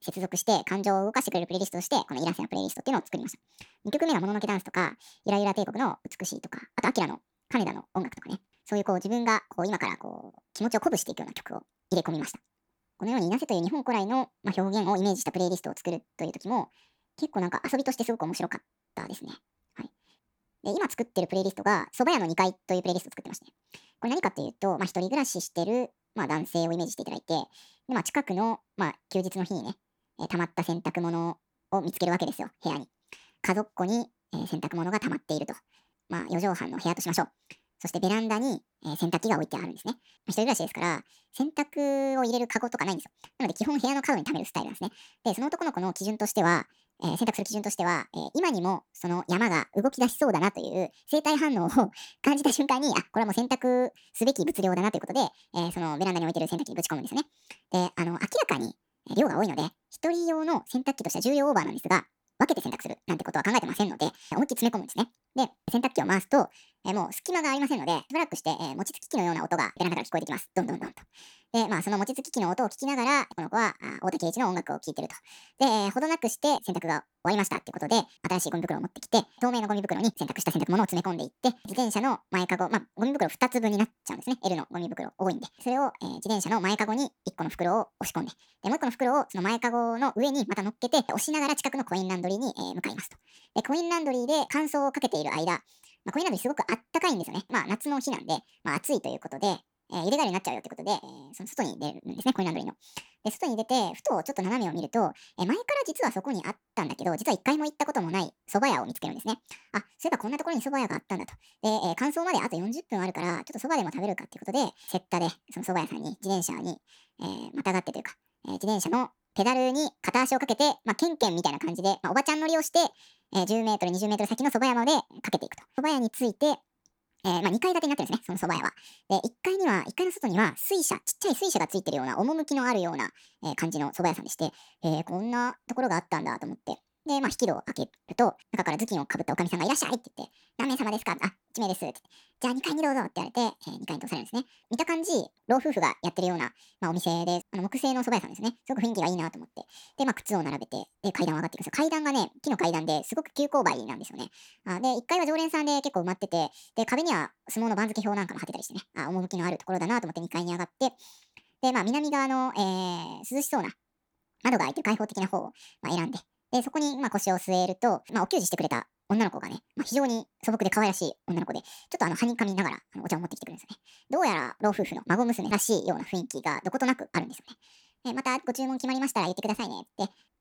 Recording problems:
wrong speed and pitch; too fast and too high; 1.7 times normal speed

